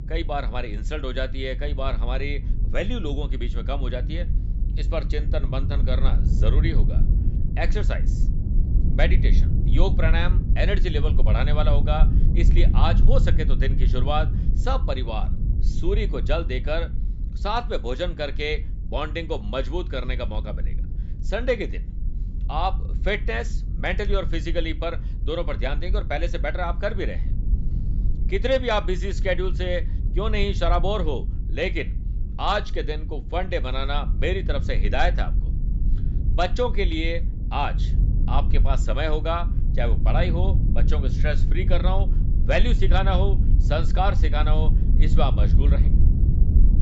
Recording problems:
high frequencies cut off; noticeable; nothing above 8 kHz
low rumble; noticeable; throughout; 15 dB below the speech

